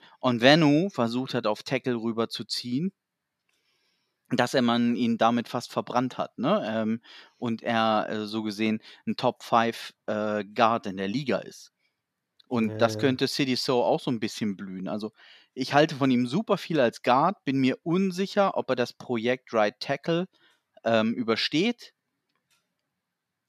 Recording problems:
none

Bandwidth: 14 kHz